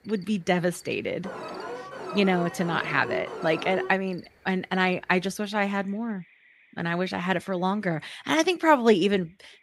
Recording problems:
animal sounds; faint; throughout; 30 dB below the speech
alarm; noticeable; from 1 to 4 s; peak 8 dB below the speech

